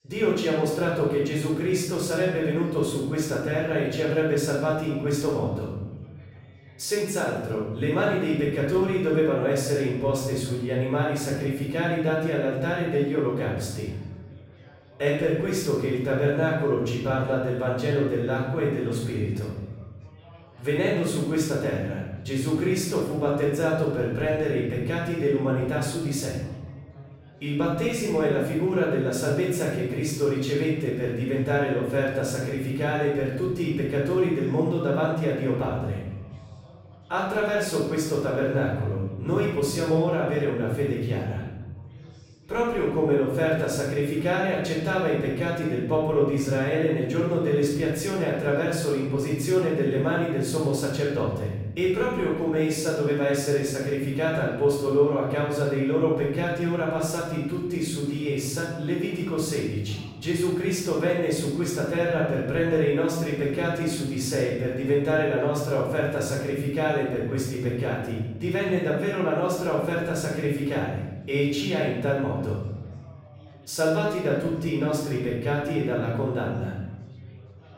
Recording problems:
off-mic speech; far
room echo; noticeable; dies away in 1.2 s
background chatter; faint; throughout; 4 voices, 30 dB below the speech

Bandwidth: 16 kHz